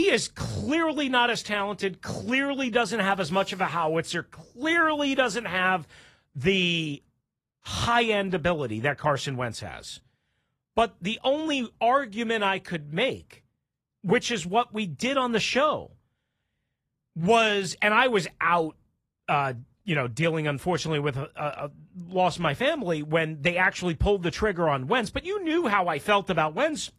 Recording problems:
garbled, watery; slightly; nothing above 14.5 kHz
abrupt cut into speech; at the start

